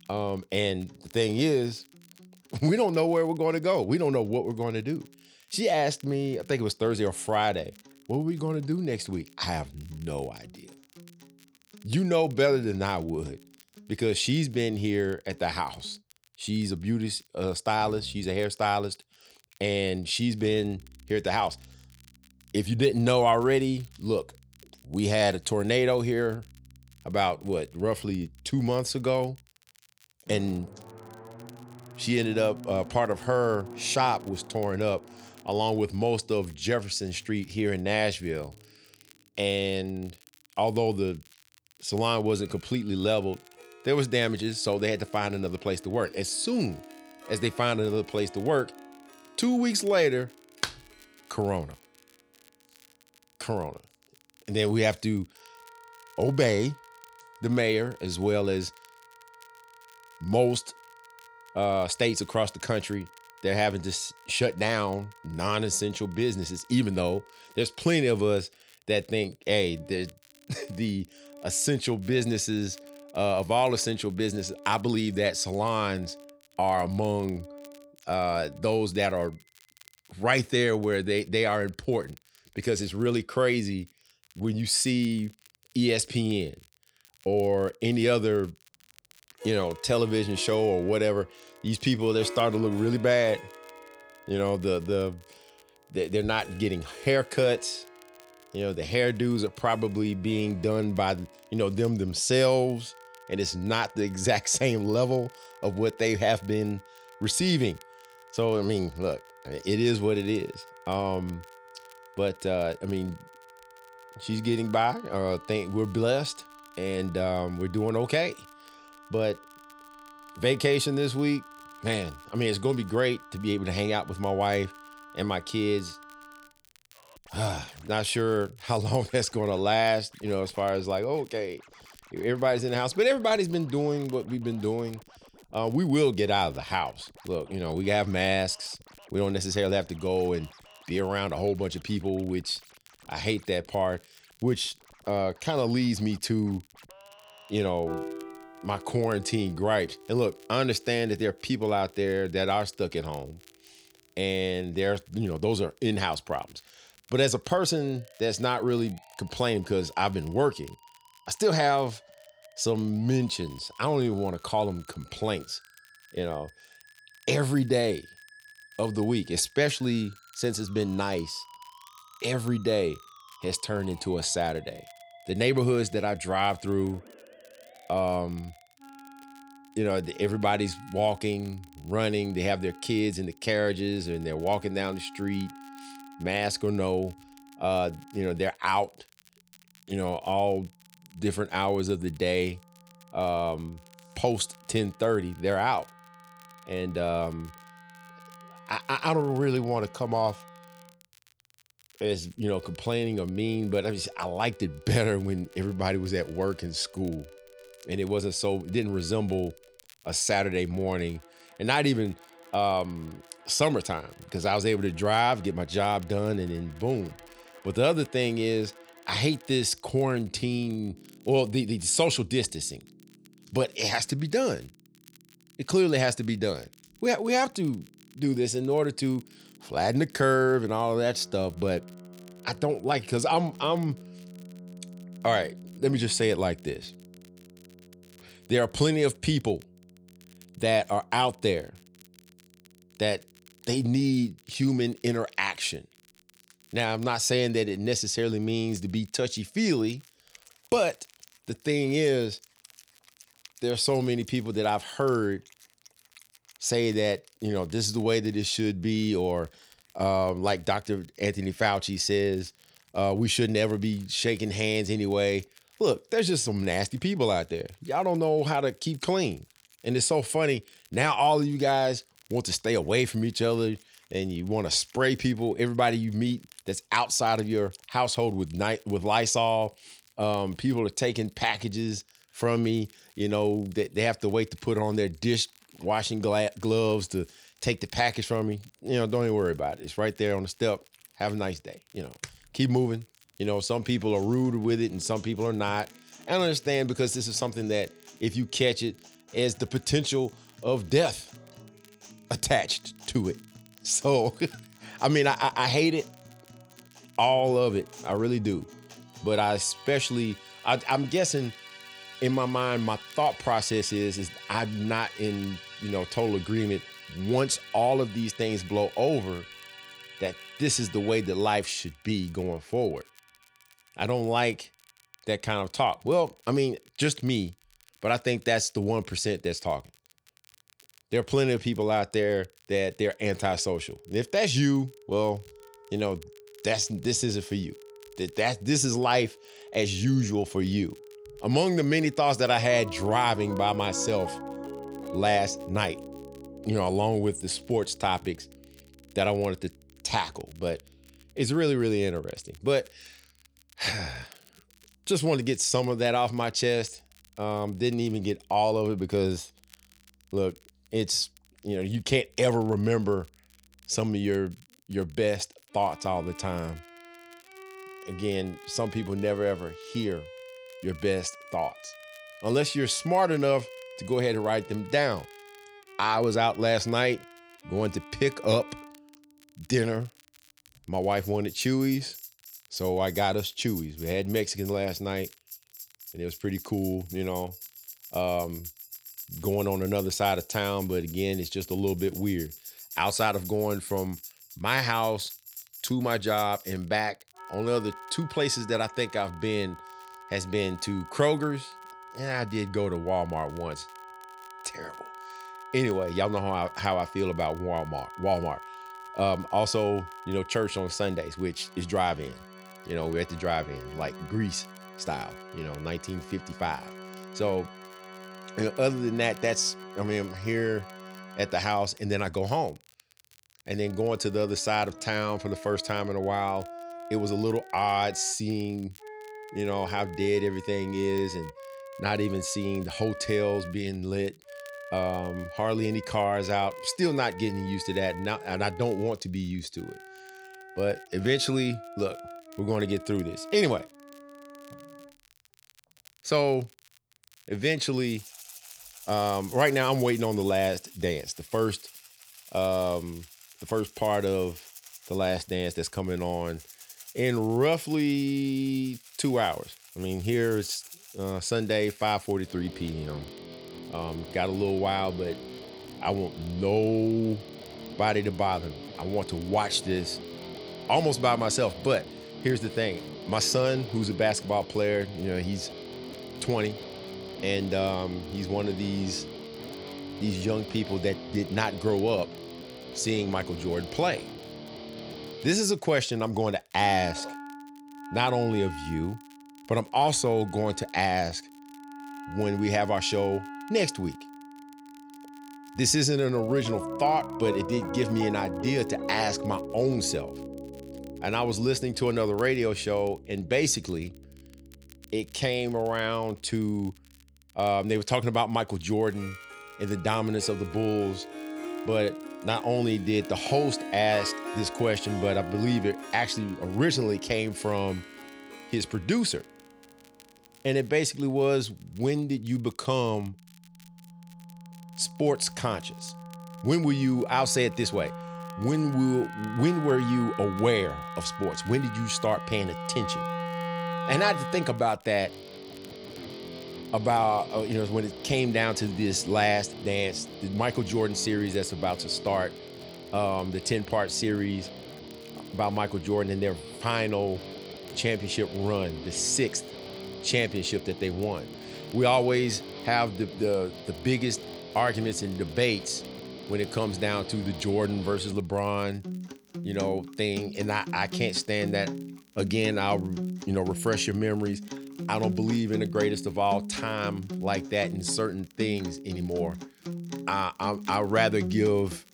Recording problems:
background music; noticeable; throughout; 15 dB below the speech
crackle, like an old record; faint; 30 dB below the speech

